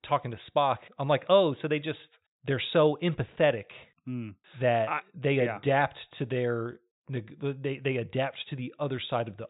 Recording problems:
high frequencies cut off; severe; nothing above 4 kHz

